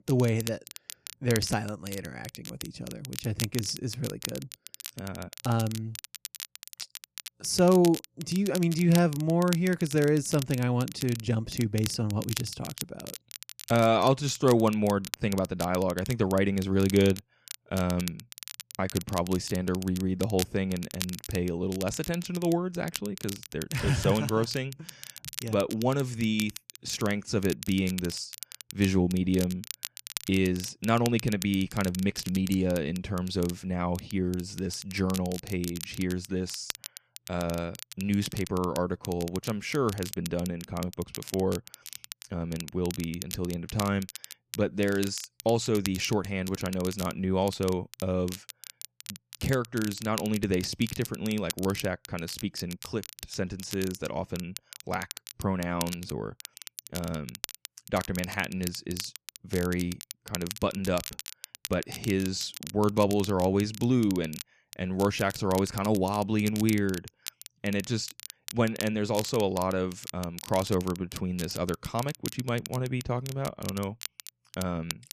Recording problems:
crackle, like an old record; noticeable; 10 dB below the speech

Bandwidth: 14.5 kHz